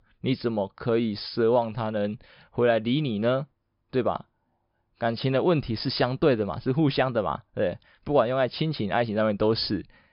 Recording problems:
high frequencies cut off; noticeable; nothing above 5.5 kHz

